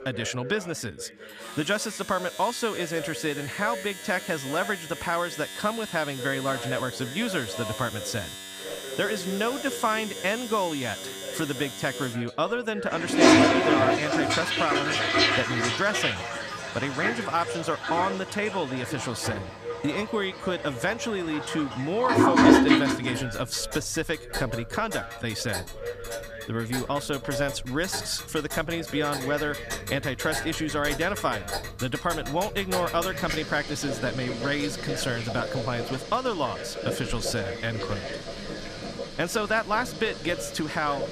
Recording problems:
household noises; very loud; throughout; as loud as the speech
voice in the background; noticeable; throughout; 10 dB below the speech

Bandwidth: 14.5 kHz